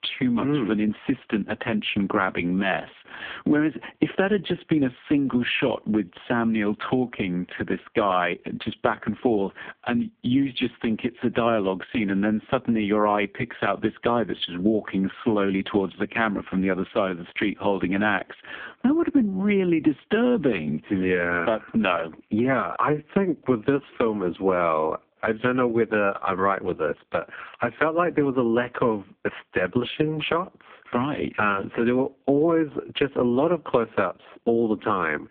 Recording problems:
phone-call audio; poor line; nothing above 3.5 kHz
squashed, flat; somewhat

